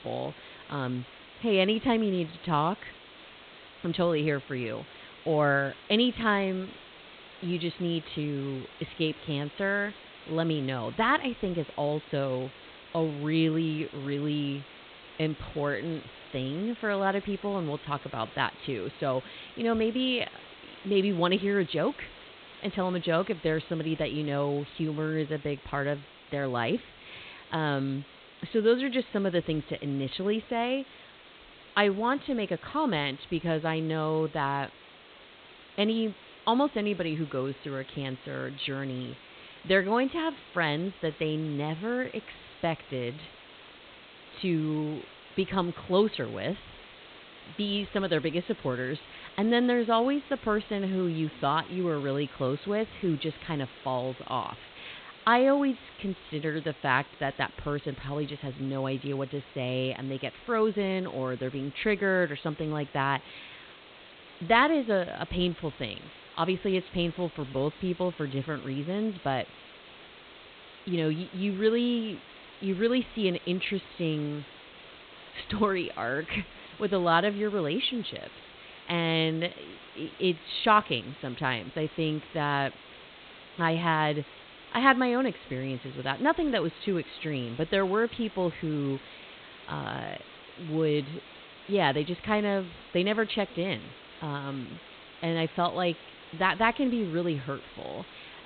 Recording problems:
high frequencies cut off; severe; nothing above 4 kHz
hiss; noticeable; throughout; 20 dB below the speech

